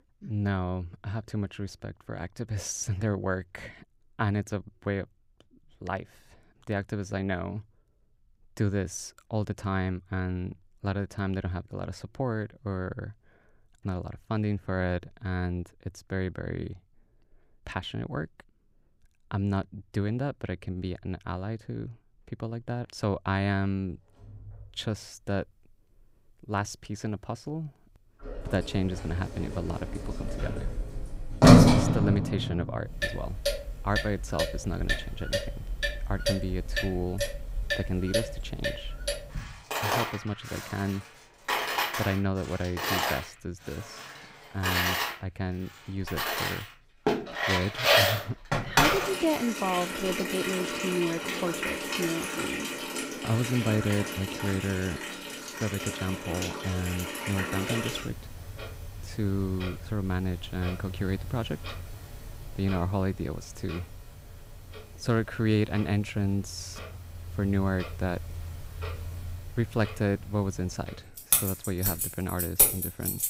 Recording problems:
household noises; very loud; from 25 s on; 4 dB above the speech

